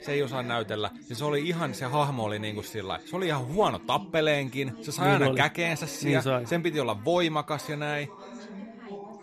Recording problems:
background chatter; noticeable; throughout; 3 voices, 15 dB below the speech

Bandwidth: 14 kHz